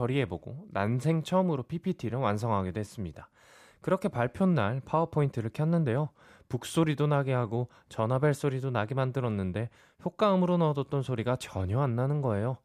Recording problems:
abrupt cut into speech; at the start

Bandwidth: 14.5 kHz